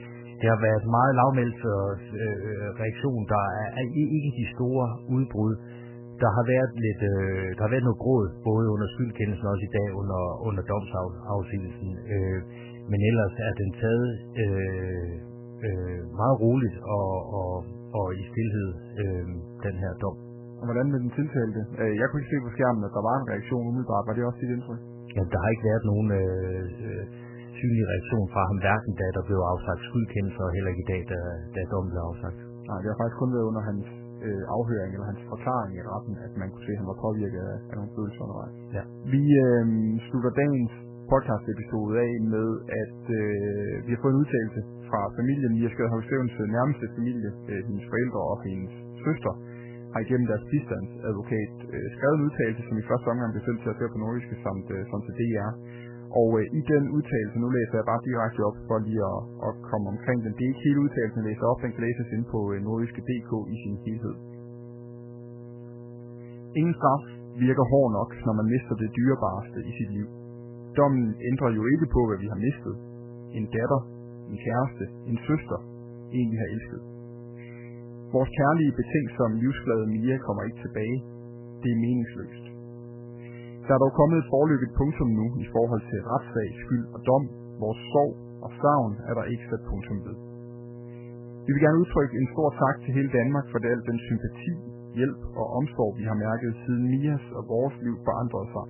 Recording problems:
garbled, watery; badly; nothing above 3 kHz
electrical hum; noticeable; throughout; 60 Hz, 20 dB below the speech

